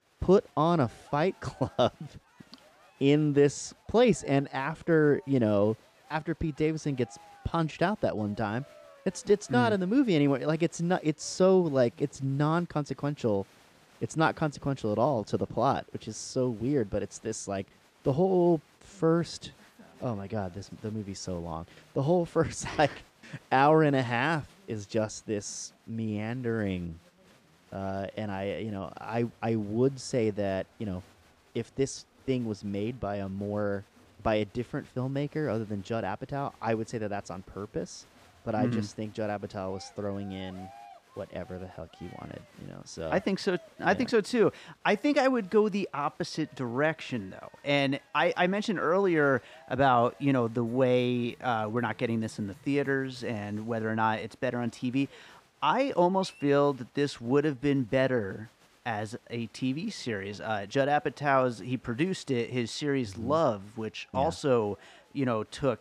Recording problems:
crowd noise; faint; throughout; 30 dB below the speech

